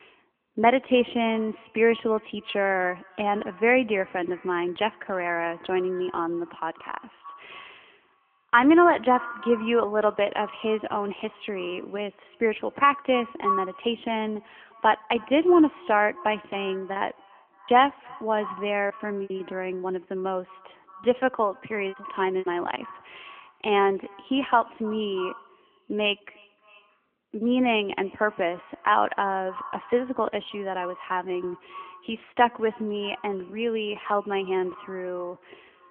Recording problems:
echo of what is said; noticeable; throughout; 310 ms later, 15 dB below the speech
phone-call audio; nothing above 3.5 kHz
choppy; very; from 17 to 19 s and at 22 s; 13% of the speech affected

